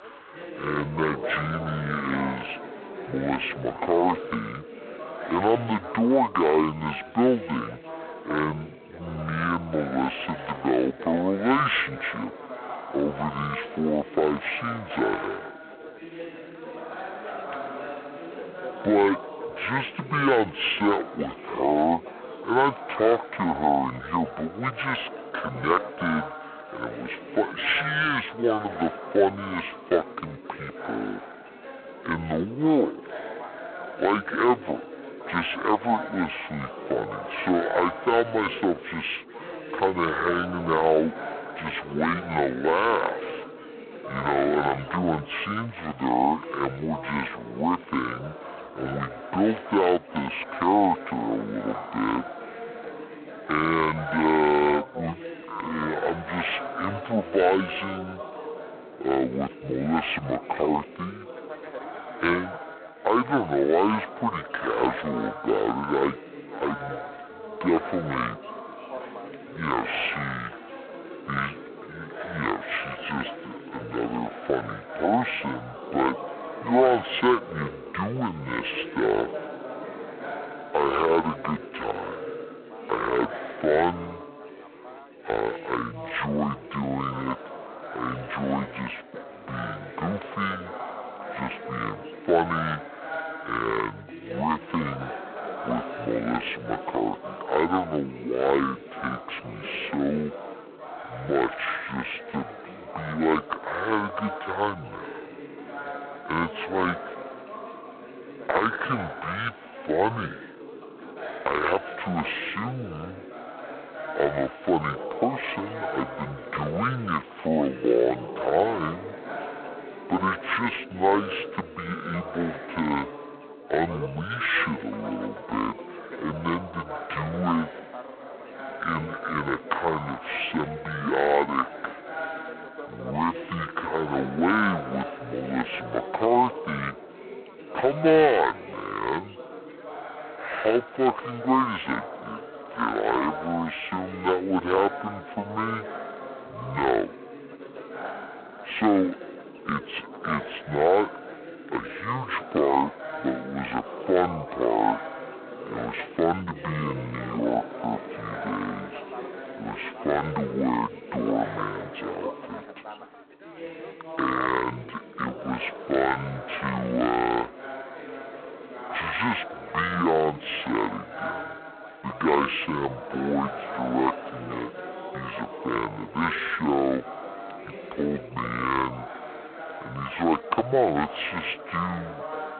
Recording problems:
phone-call audio; poor line
wrong speed and pitch; too slow and too low; 0.6 times normal speed
background chatter; noticeable; throughout; 4 voices, 10 dB below the speech

